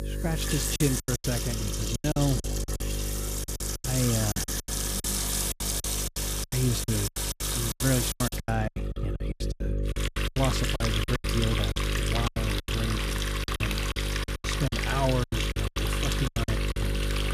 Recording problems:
electrical hum; loud; throughout; 50 Hz, 7 dB below the speech
household noises; loud; throughout; as loud as the speech
choppy; very; 18% of the speech affected

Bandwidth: 14.5 kHz